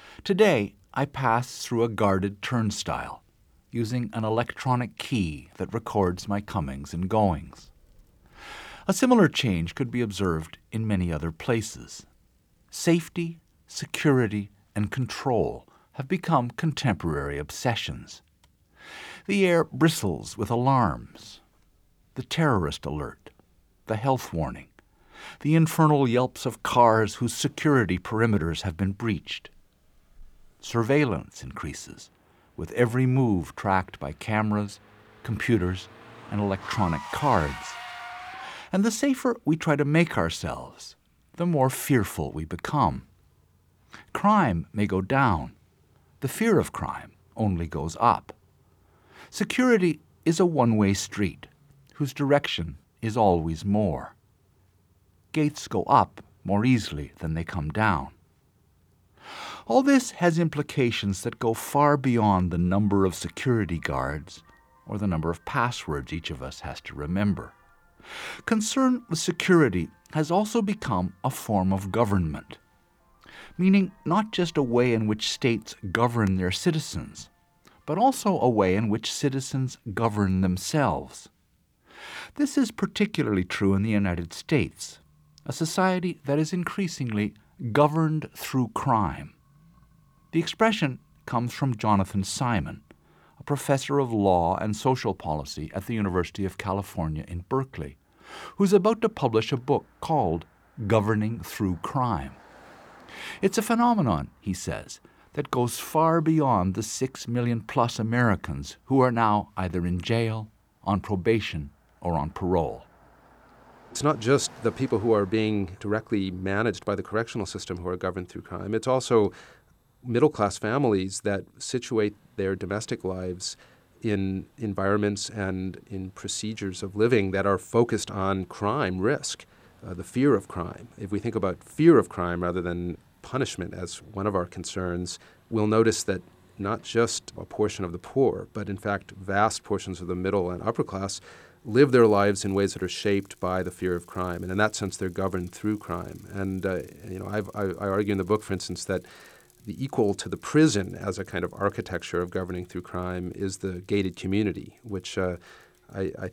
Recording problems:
traffic noise; faint; throughout; 25 dB below the speech

